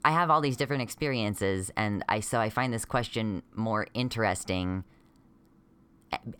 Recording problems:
none

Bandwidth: 18 kHz